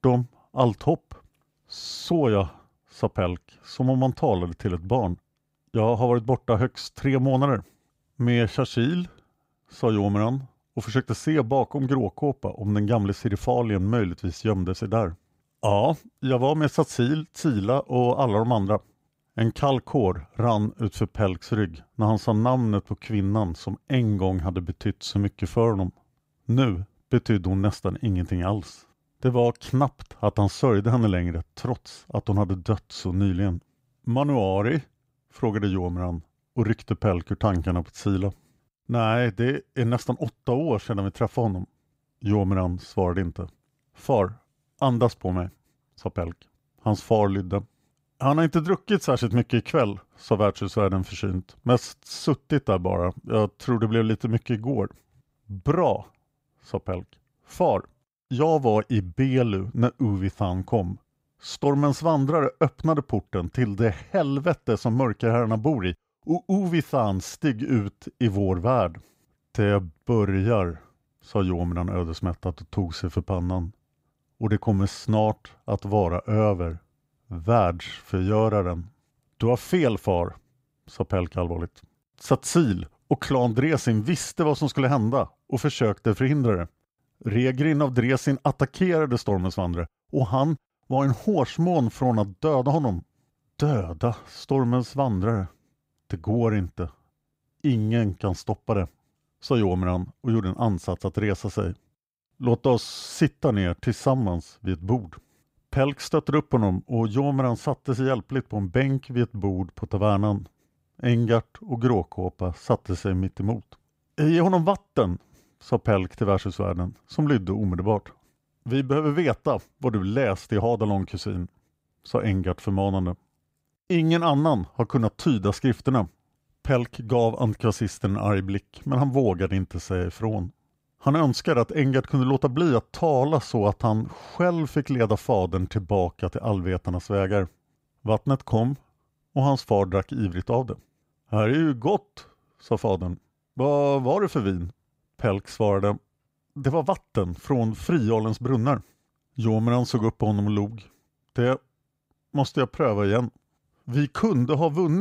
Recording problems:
abrupt cut into speech; at the end

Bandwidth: 15.5 kHz